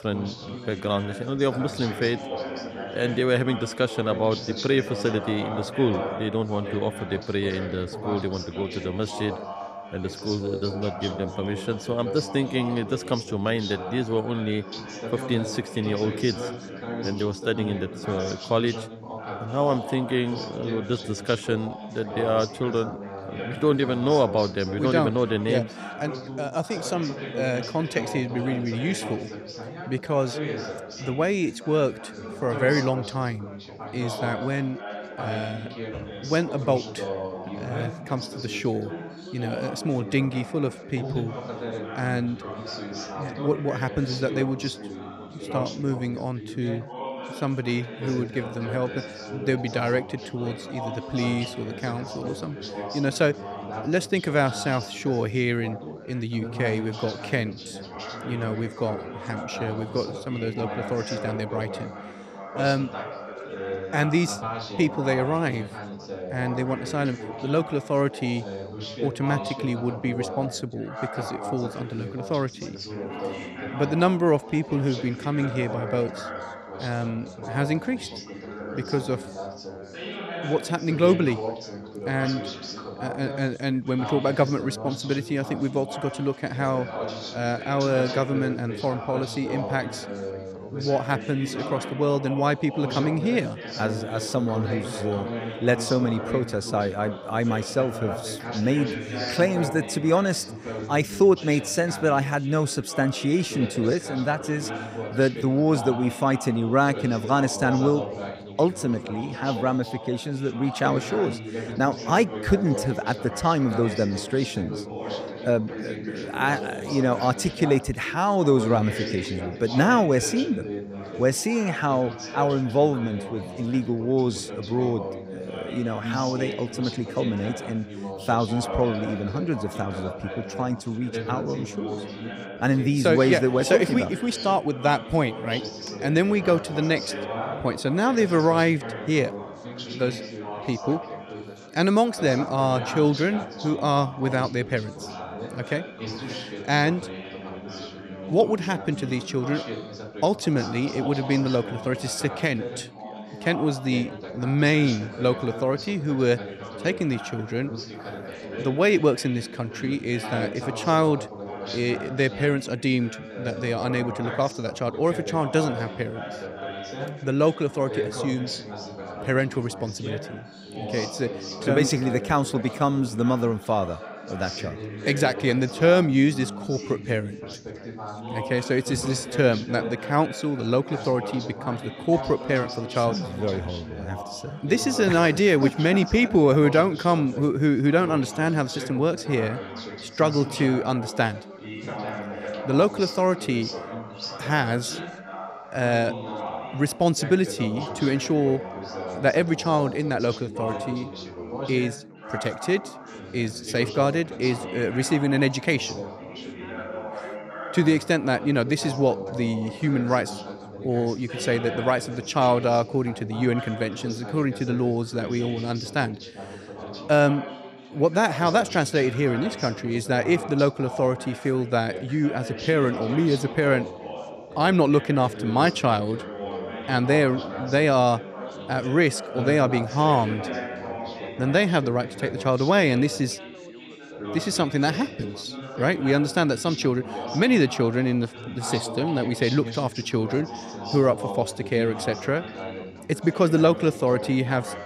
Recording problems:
background chatter; loud; throughout; 4 voices, 10 dB below the speech

